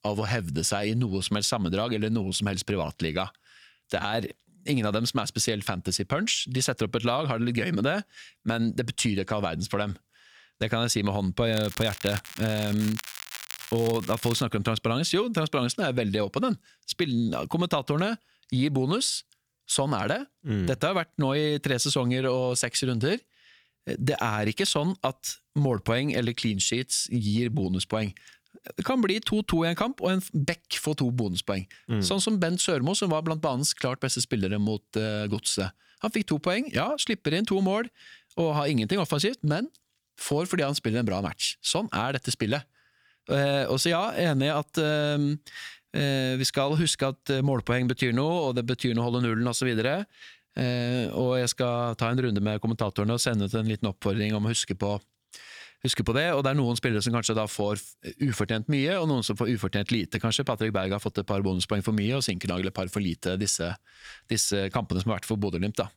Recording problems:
crackling; noticeable; from 12 to 14 s; 10 dB below the speech

